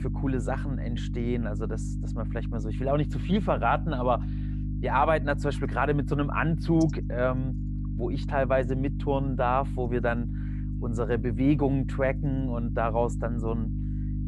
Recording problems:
electrical hum; noticeable; throughout; 50 Hz, 15 dB below the speech

